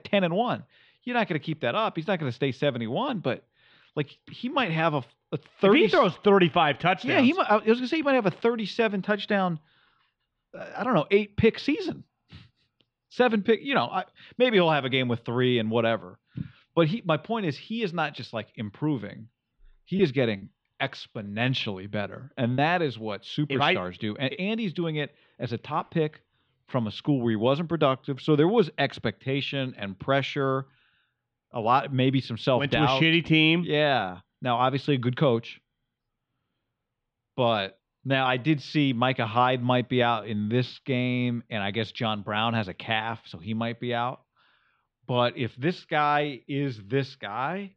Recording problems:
muffled; slightly; fading above 3.5 kHz
choppy; very; from 20 to 23 s; 6% of the speech affected

